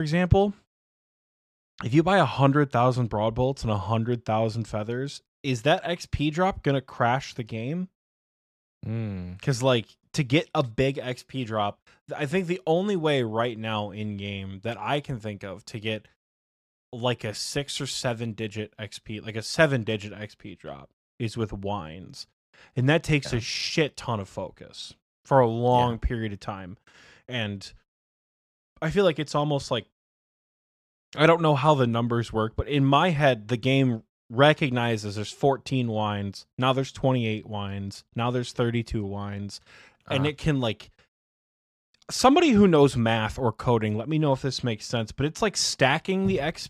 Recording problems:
abrupt cut into speech; at the start

